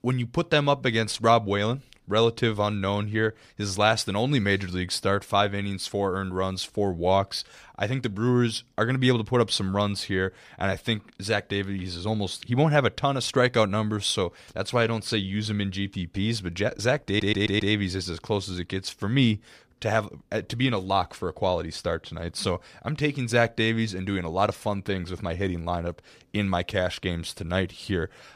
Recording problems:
audio stuttering; at 17 s

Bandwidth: 15 kHz